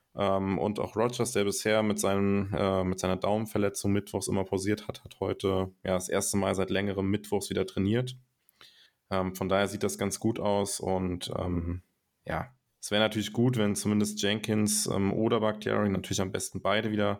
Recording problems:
none

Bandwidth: 19 kHz